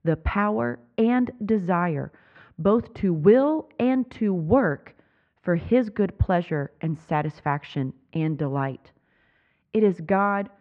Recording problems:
muffled; very; fading above 2 kHz

